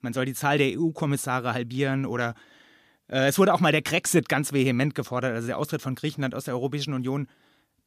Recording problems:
none

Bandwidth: 15 kHz